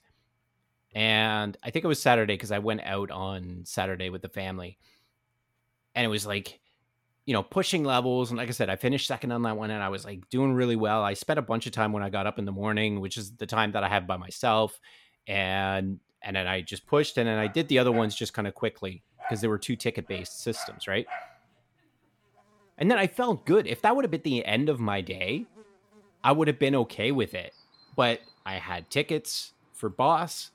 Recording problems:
animal sounds; noticeable; from 16 s on; 20 dB below the speech

